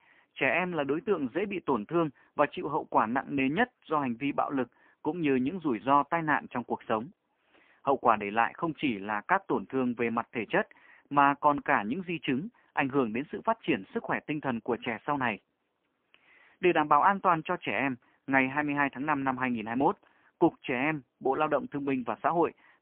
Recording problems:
phone-call audio; poor line

